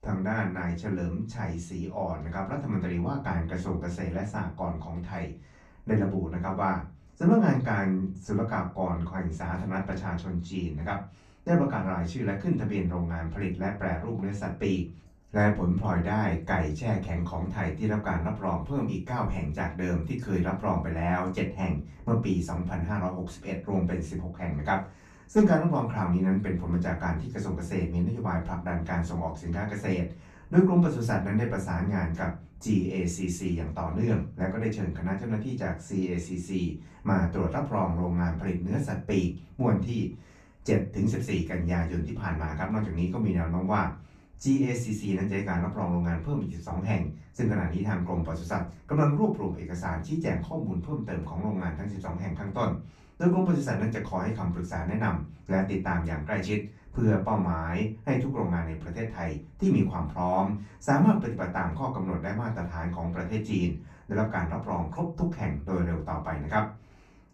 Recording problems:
off-mic speech; far
room echo; slight; dies away in 0.3 s

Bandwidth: 13.5 kHz